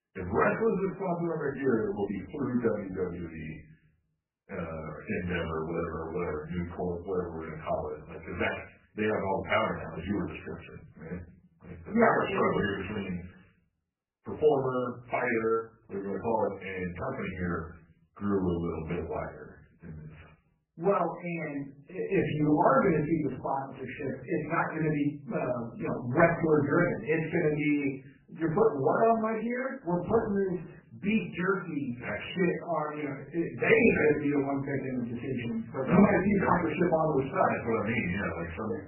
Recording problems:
off-mic speech; far
garbled, watery; badly; nothing above 3 kHz
room echo; slight; dies away in 0.4 s

